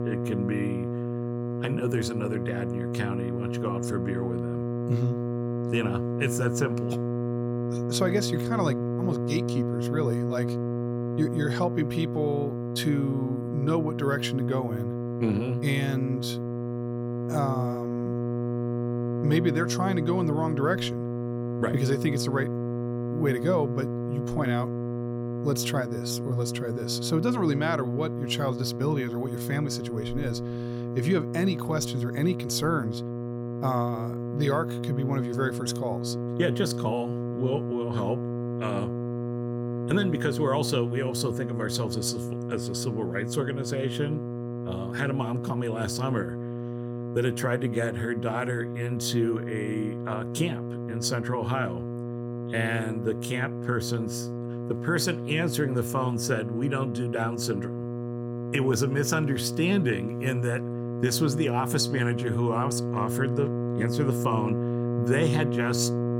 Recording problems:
electrical hum; loud; throughout; 60 Hz, 5 dB below the speech

